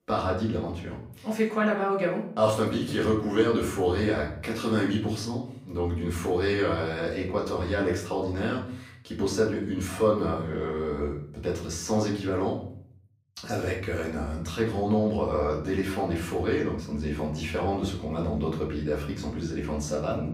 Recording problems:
off-mic speech; far
room echo; slight; dies away in 0.6 s

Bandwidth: 15.5 kHz